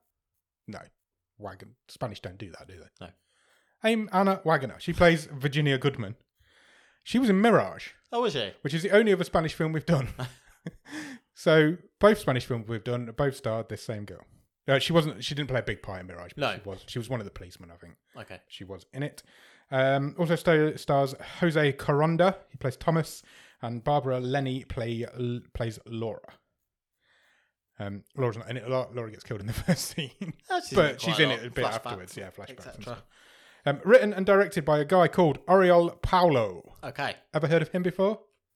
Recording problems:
none

